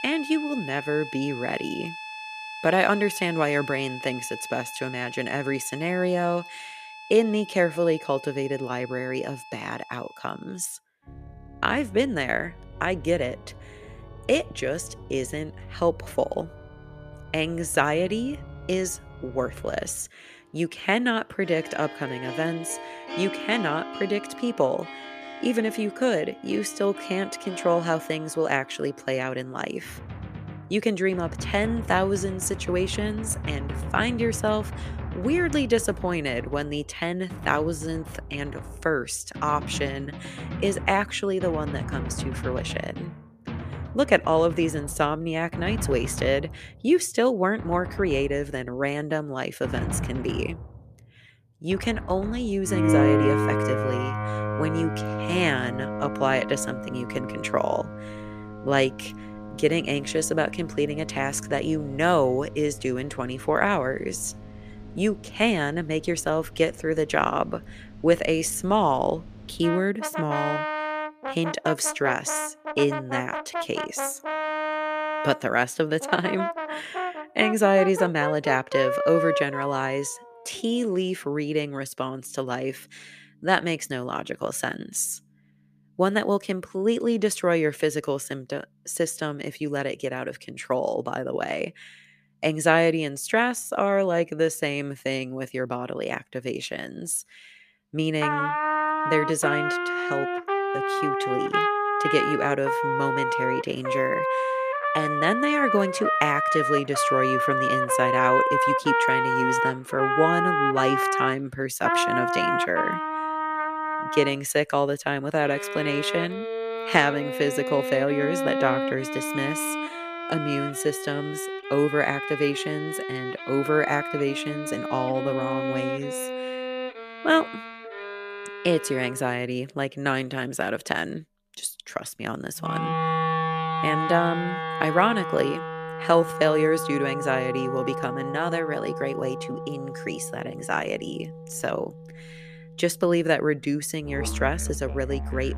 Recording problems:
background music; loud; throughout; 3 dB below the speech

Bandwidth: 14.5 kHz